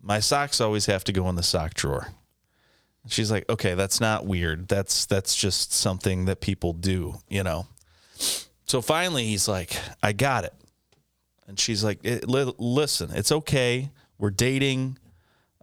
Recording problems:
squashed, flat; heavily

